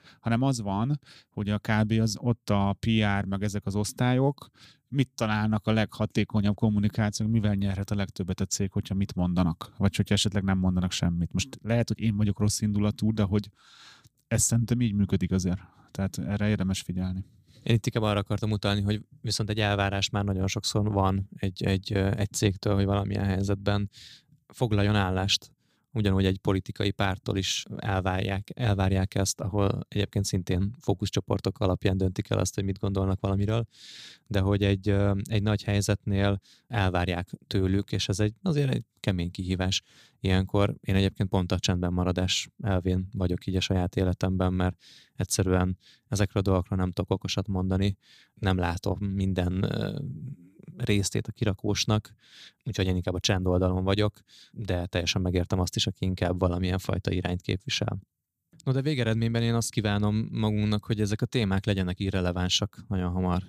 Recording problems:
none

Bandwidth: 15 kHz